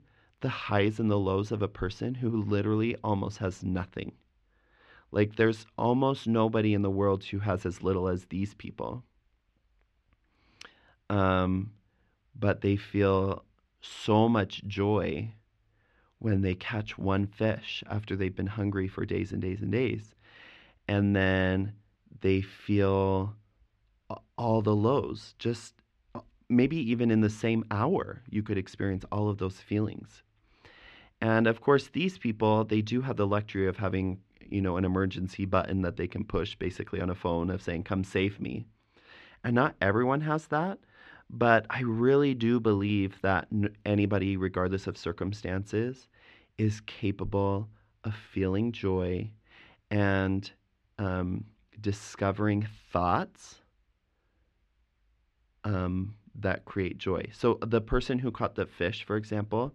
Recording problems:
muffled; very; fading above 2.5 kHz

